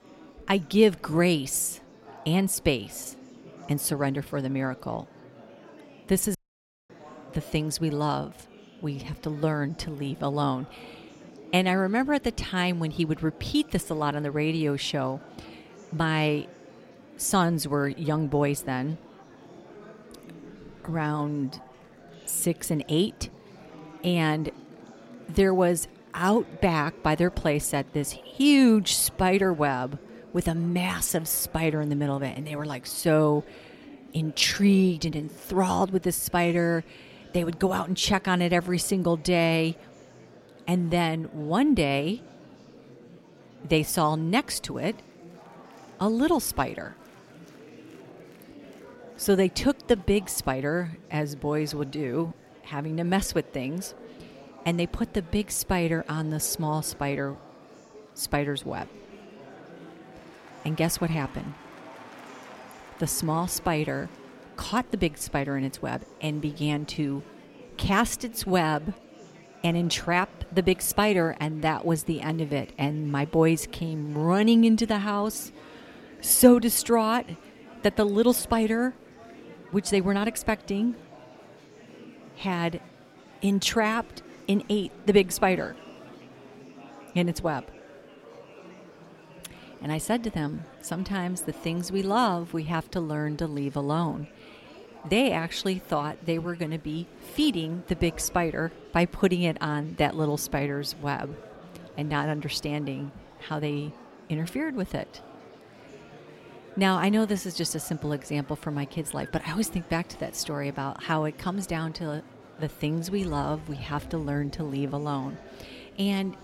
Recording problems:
murmuring crowd; faint; throughout; 20 dB below the speech
audio cutting out; at 6.5 s for 0.5 s

